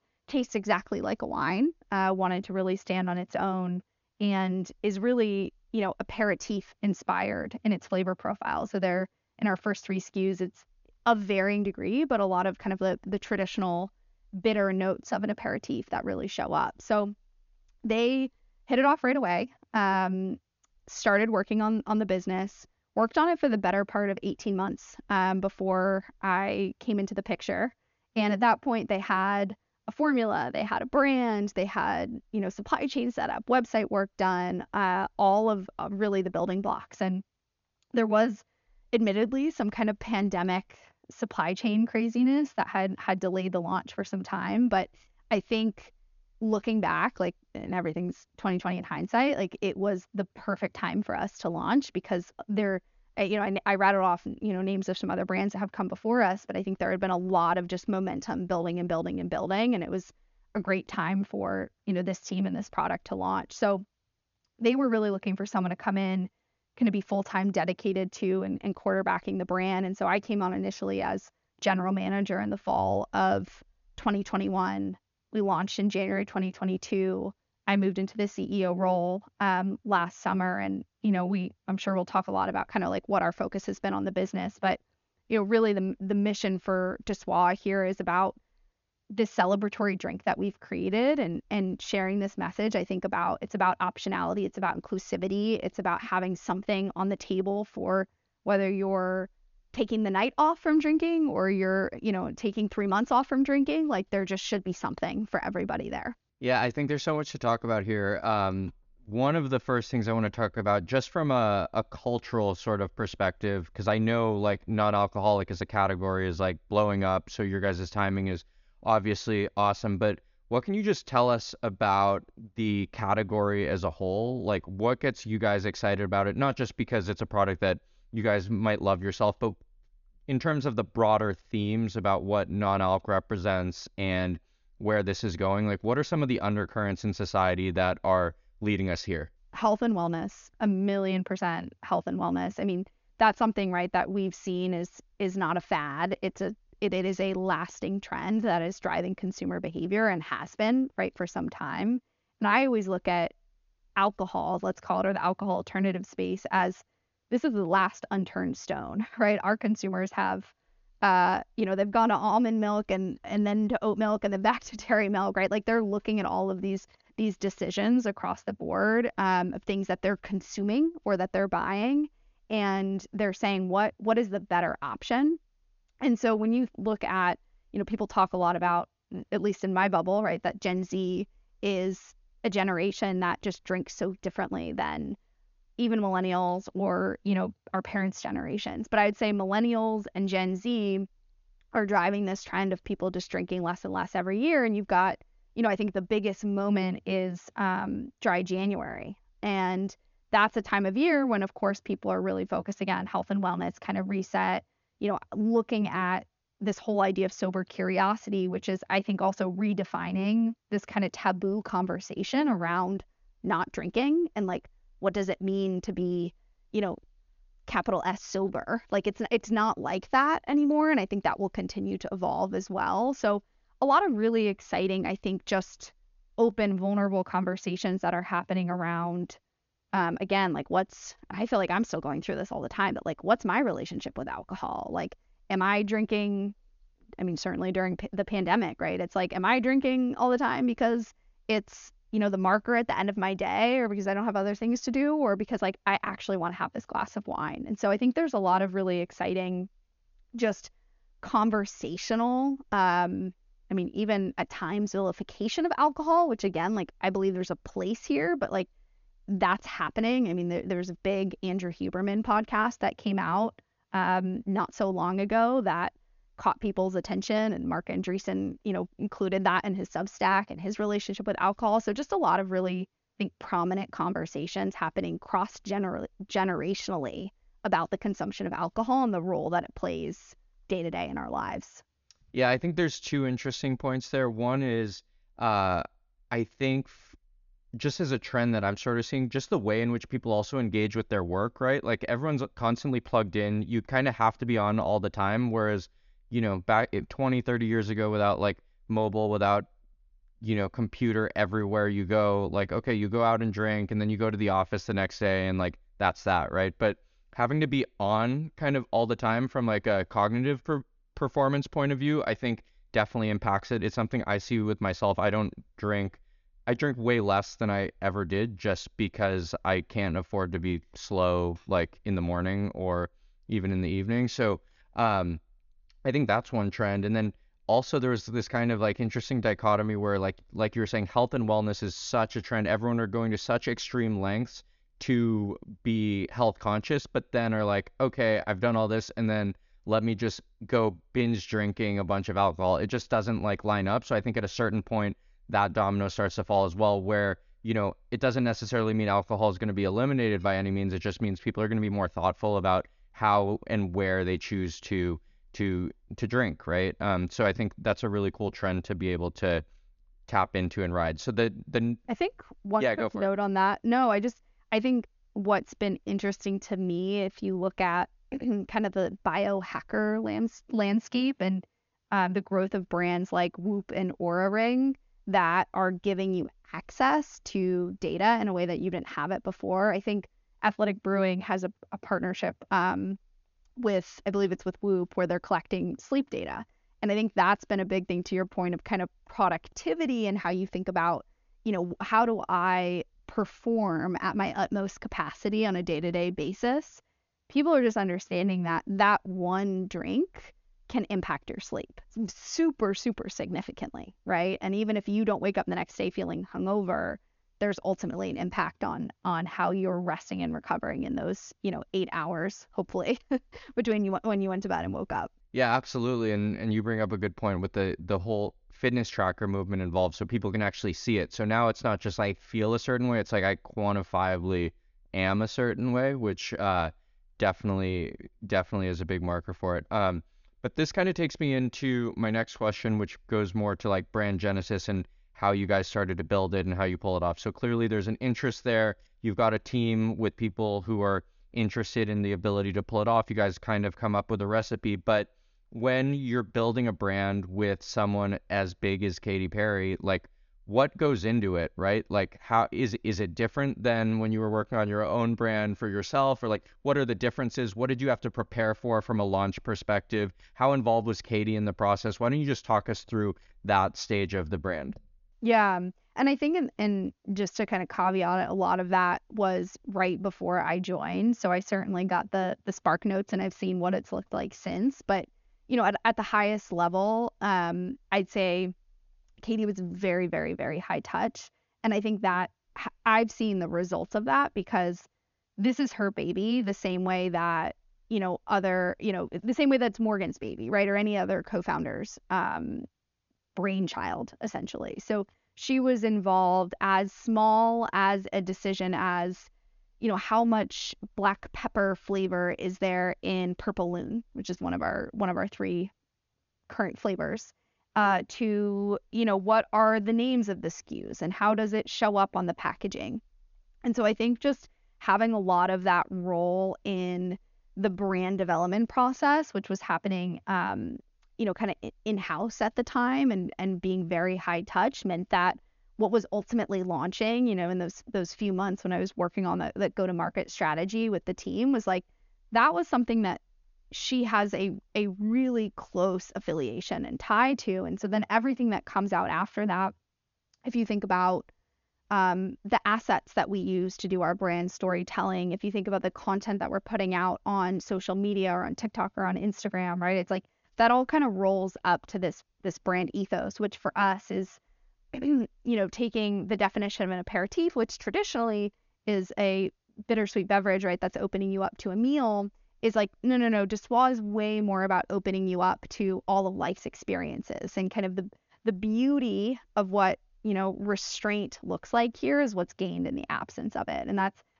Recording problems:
high frequencies cut off; noticeable; nothing above 7 kHz

